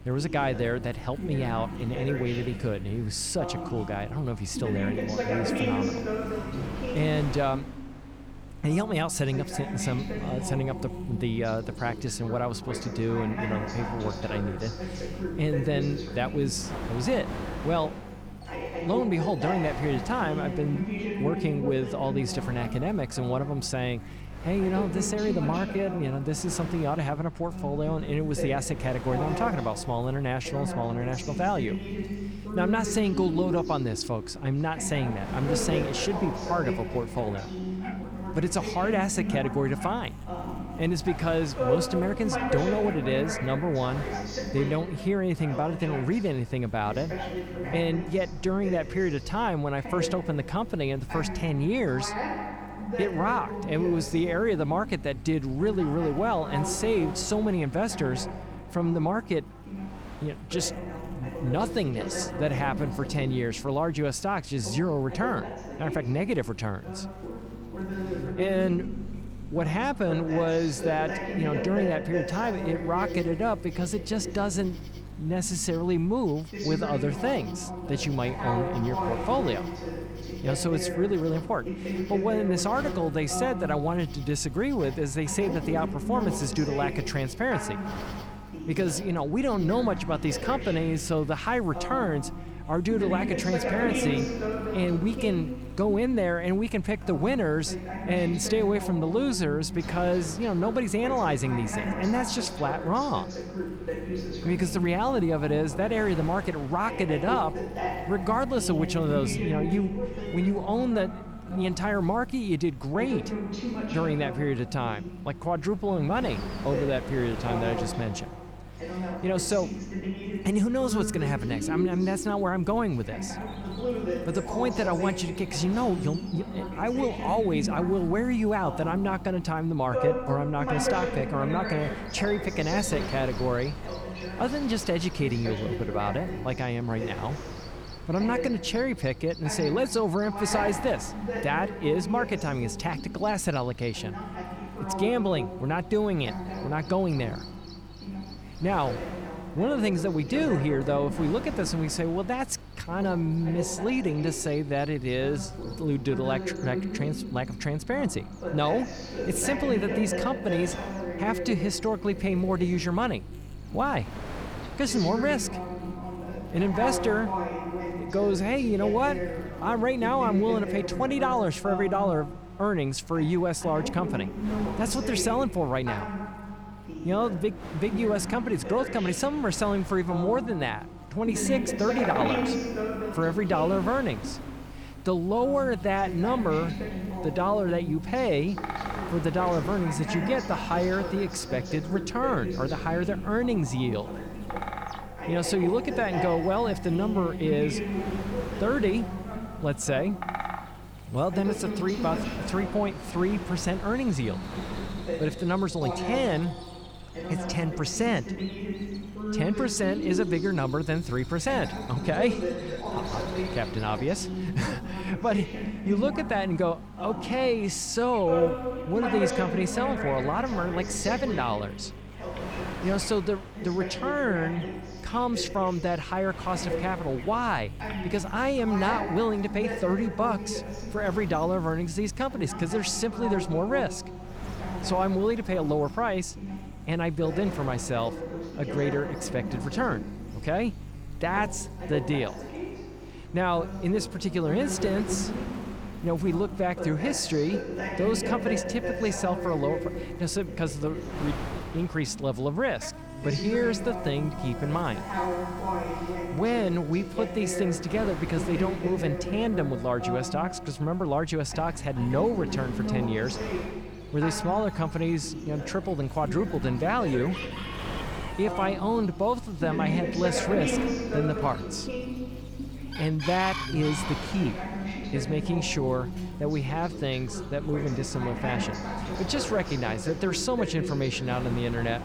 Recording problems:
voice in the background; loud; throughout; 6 dB below the speech
animal sounds; noticeable; throughout; 20 dB below the speech
wind noise on the microphone; occasional gusts; 15 dB below the speech
electrical hum; faint; throughout; 50 Hz, 25 dB below the speech

